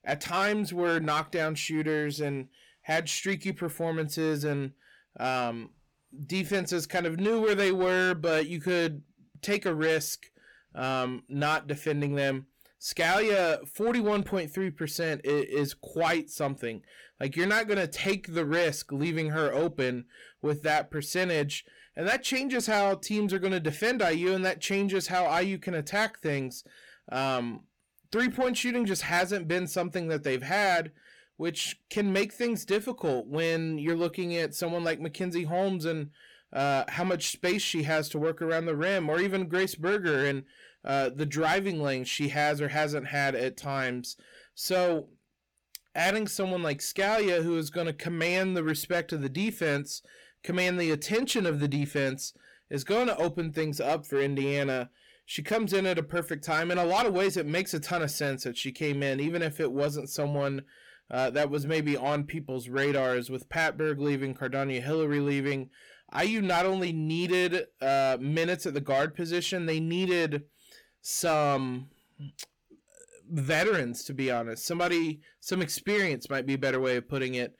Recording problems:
distortion; slight; 10 dB below the speech

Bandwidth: 18.5 kHz